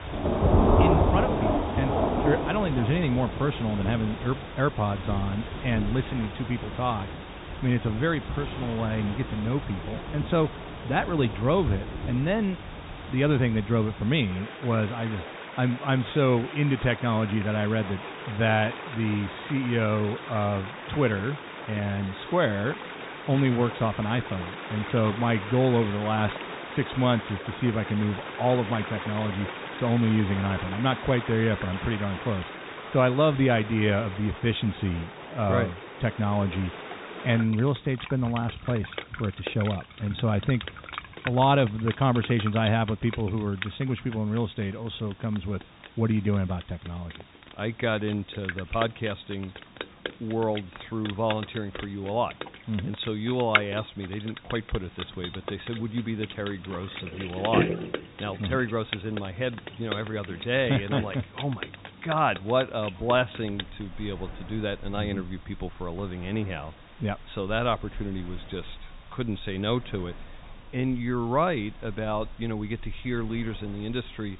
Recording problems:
high frequencies cut off; severe; nothing above 4 kHz
rain or running water; loud; throughout; 6 dB below the speech
hiss; faint; throughout; 25 dB below the speech

